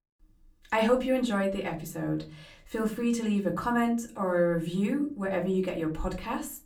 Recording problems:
off-mic speech; far
room echo; very slight; dies away in 0.4 s

